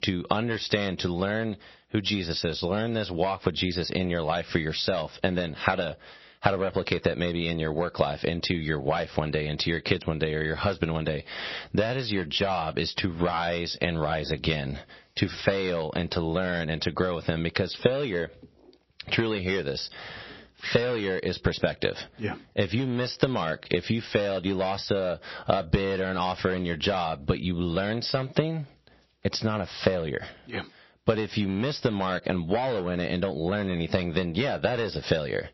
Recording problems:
squashed, flat; heavily
distortion; slight; 3% of the sound clipped
garbled, watery; slightly; nothing above 5.5 kHz

